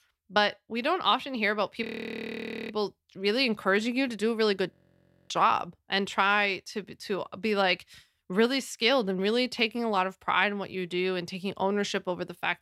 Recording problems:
audio freezing; at 2 s for 1 s and at 4.5 s for 0.5 s

